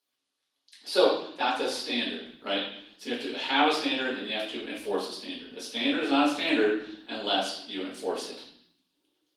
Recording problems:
off-mic speech; far
room echo; noticeable; dies away in 0.7 s
garbled, watery; slightly
thin; very slightly; fading below 300 Hz

